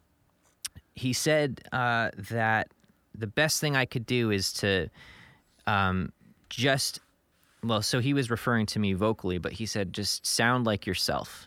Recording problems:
none

